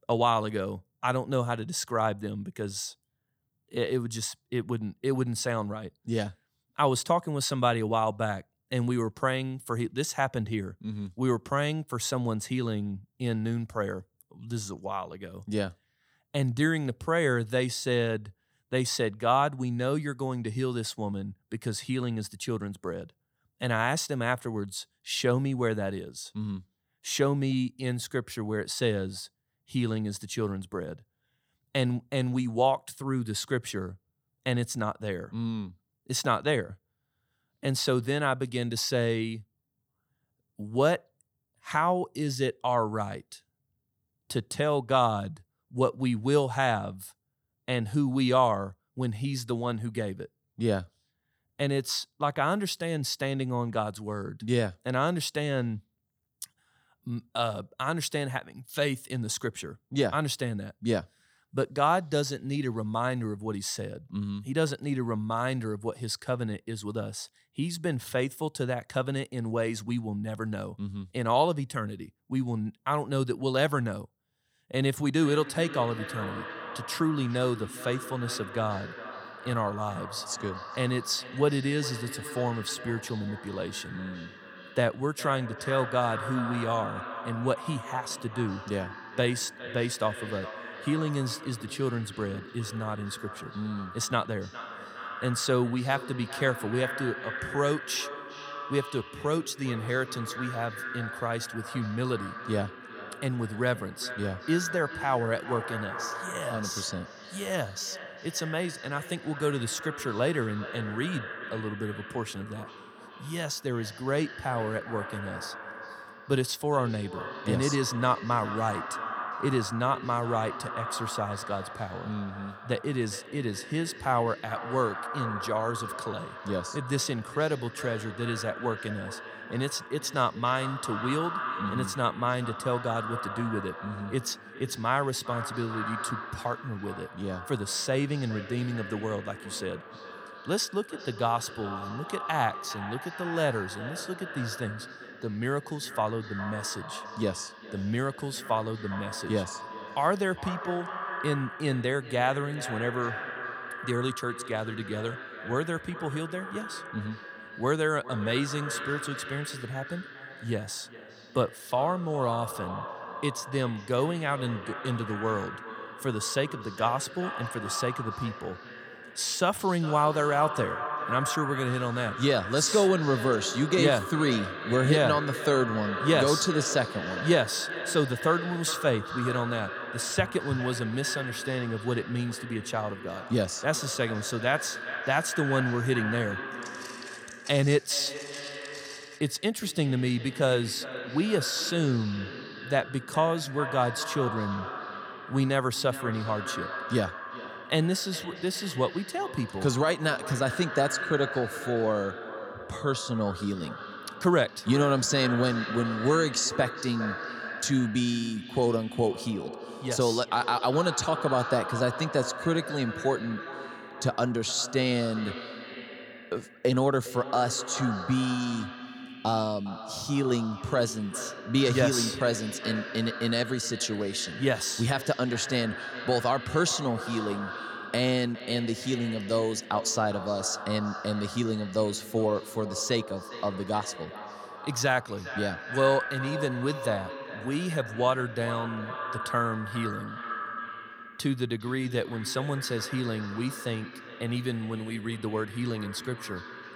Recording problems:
echo of what is said; strong; from 1:15 on; 410 ms later, 9 dB below the speech
footsteps; faint; from 3:07 to 3:09; peak 15 dB below the speech

